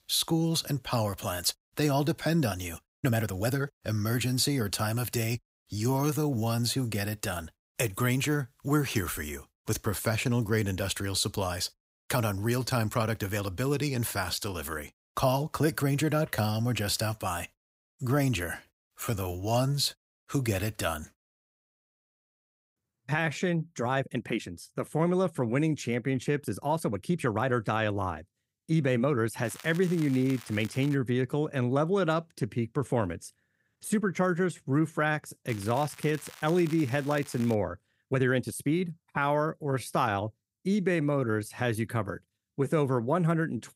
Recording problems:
crackling; noticeable; from 29 to 31 s and from 35 to 38 s; 20 dB below the speech
uneven, jittery; strongly; from 3 to 42 s

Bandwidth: 15.5 kHz